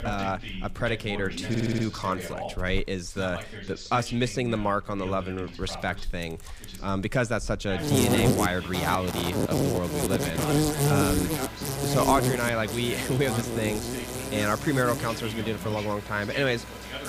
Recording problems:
animal sounds; very loud; throughout; as loud as the speech
voice in the background; noticeable; throughout; 10 dB below the speech
audio stuttering; at 1.5 s

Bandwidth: 15 kHz